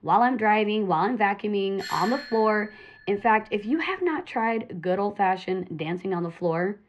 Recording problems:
muffled; slightly; fading above 2.5 kHz
doorbell; noticeable; from 2 to 3.5 s; peak 8 dB below the speech

